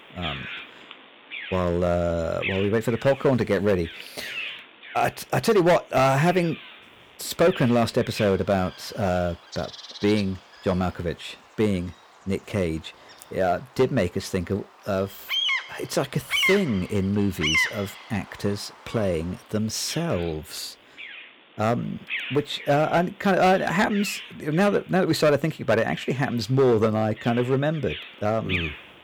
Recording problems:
distortion; slight; 3% of the sound clipped
animal sounds; loud; throughout; 6 dB below the speech

